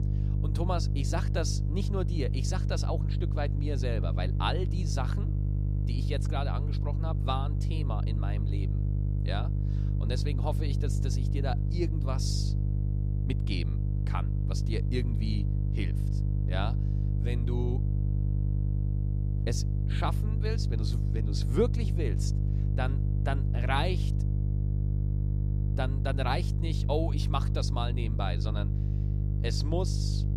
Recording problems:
electrical hum; loud; throughout; 50 Hz, 7 dB below the speech

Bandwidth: 14.5 kHz